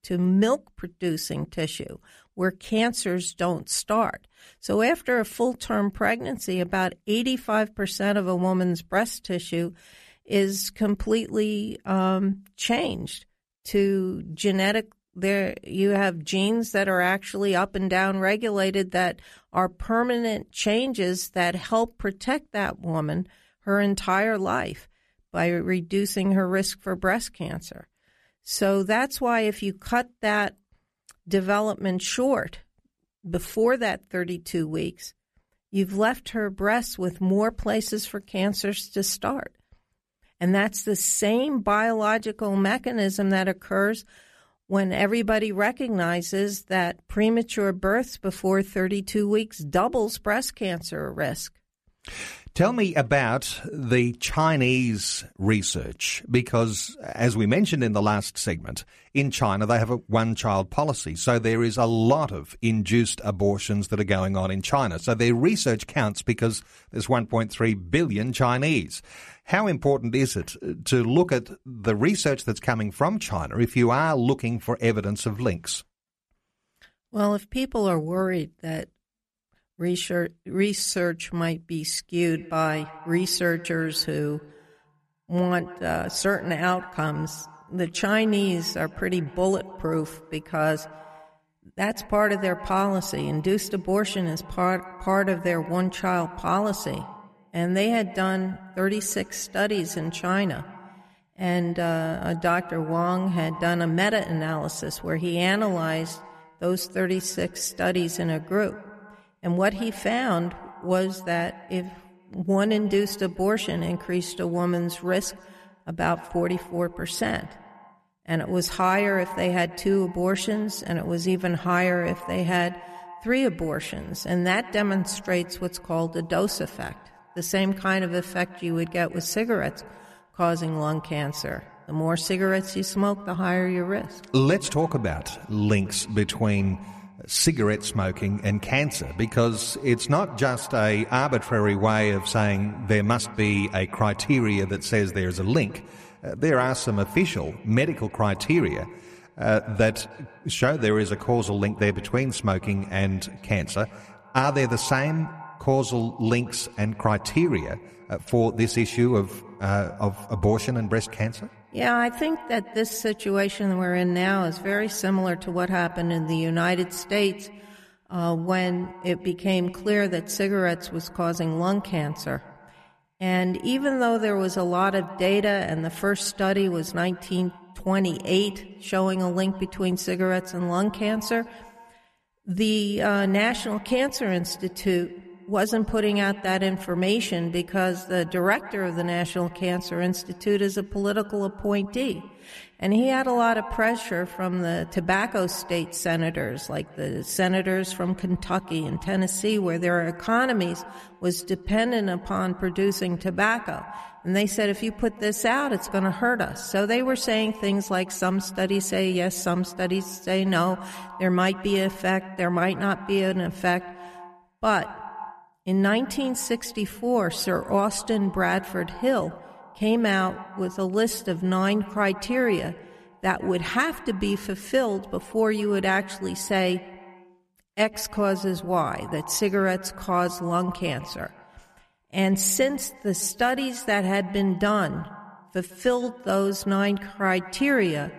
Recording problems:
echo of what is said; noticeable; from 1:22 on; 150 ms later, 15 dB below the speech

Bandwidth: 14 kHz